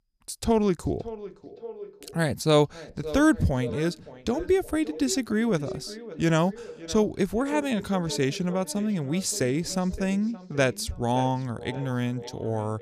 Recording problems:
echo of what is said; noticeable; throughout; 570 ms later, 15 dB below the speech

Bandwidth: 14.5 kHz